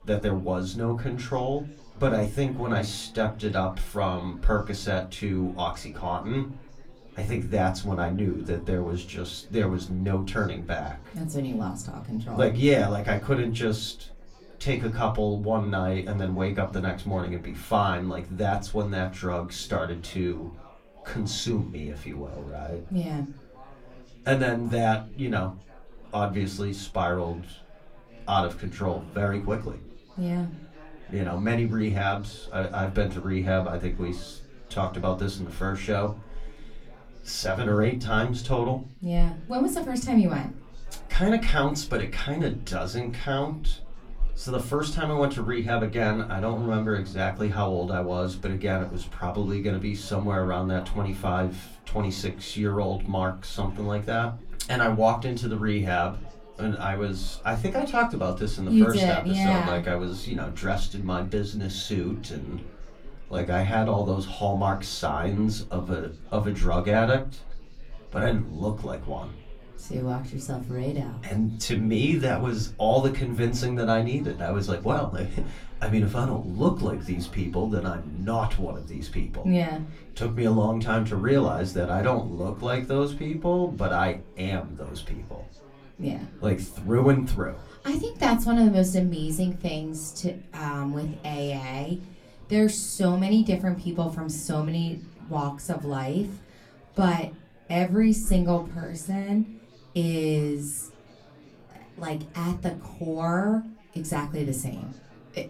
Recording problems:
off-mic speech; far
room echo; very slight; dies away in 0.3 s
chatter from many people; faint; throughout; 25 dB below the speech

